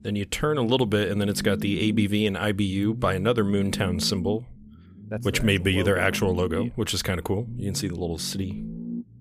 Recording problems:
low rumble; noticeable; throughout; 15 dB below the speech

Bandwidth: 15 kHz